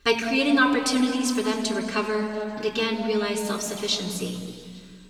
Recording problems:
off-mic speech; far
room echo; noticeable; dies away in 2.4 s

